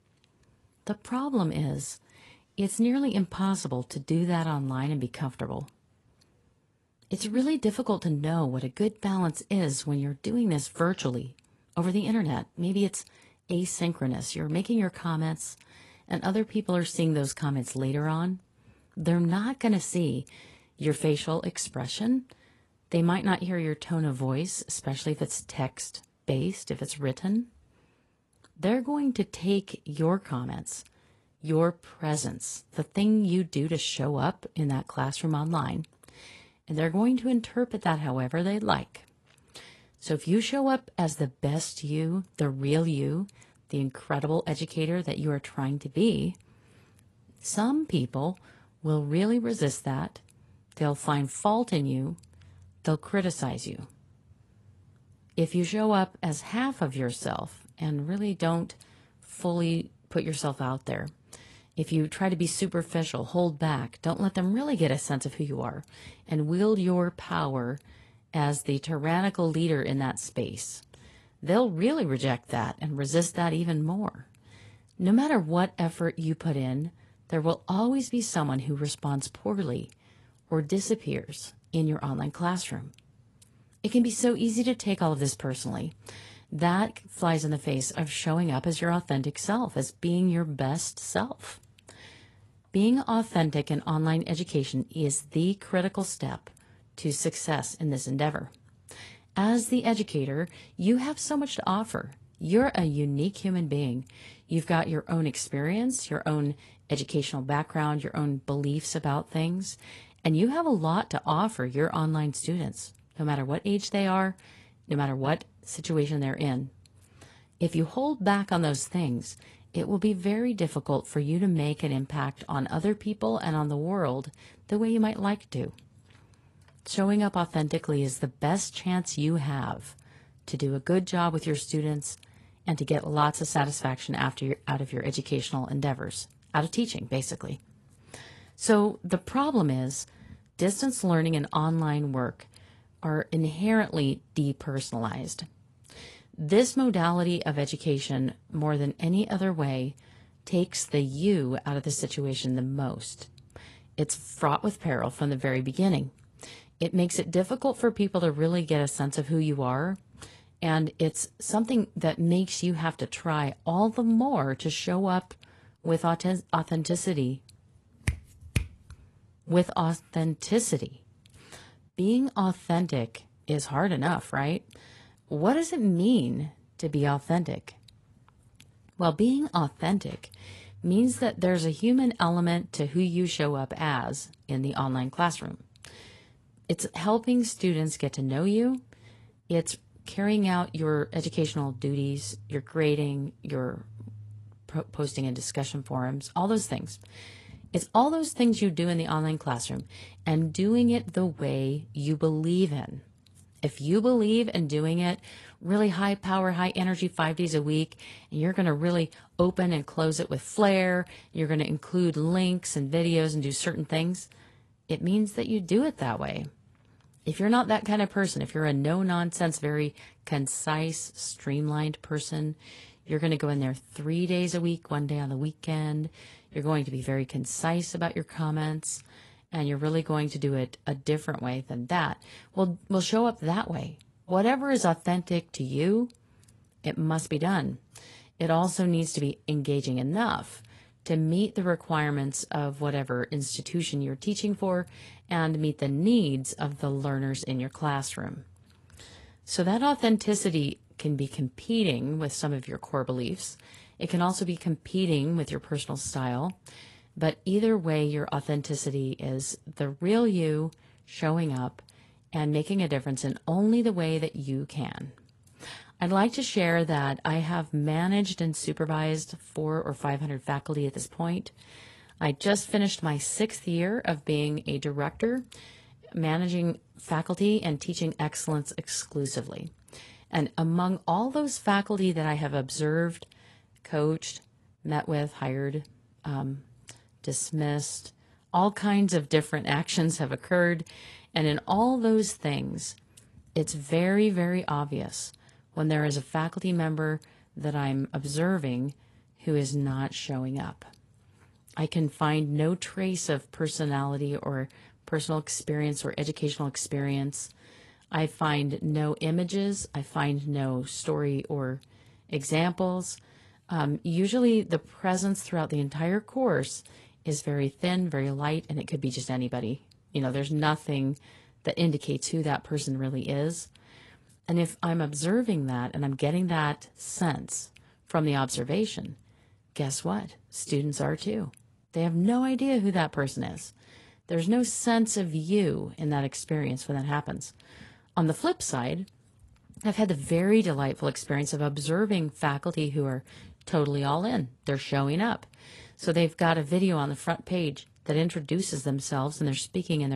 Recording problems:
garbled, watery; slightly; nothing above 11 kHz
abrupt cut into speech; at the end

